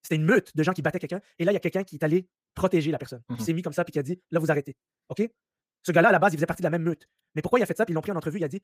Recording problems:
wrong speed, natural pitch; too fast; 1.7 times normal speed

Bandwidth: 15 kHz